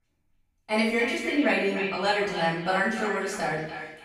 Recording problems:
echo of what is said; strong; throughout; 290 ms later, 8 dB below the speech
off-mic speech; far
room echo; noticeable; dies away in 0.6 s

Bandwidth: 15.5 kHz